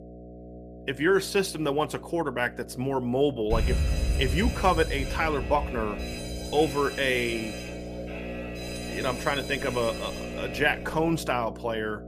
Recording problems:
electrical hum; noticeable; throughout; 60 Hz, 15 dB below the speech
alarm; loud; from 3.5 to 11 s; peak level with the speech

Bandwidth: 14.5 kHz